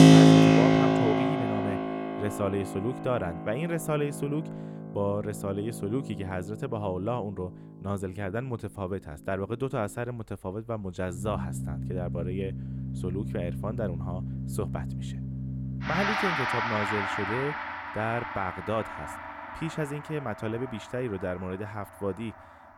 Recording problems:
background music; very loud; throughout; 5 dB above the speech

